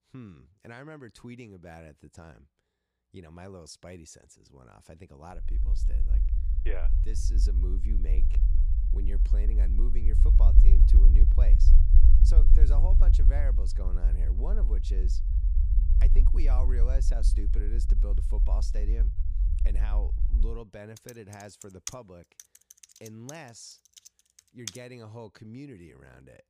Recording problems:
low rumble; loud; from 5.5 to 20 s; 3 dB below the speech
keyboard typing; loud; from 21 to 25 s; peak 5 dB above the speech

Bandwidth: 15 kHz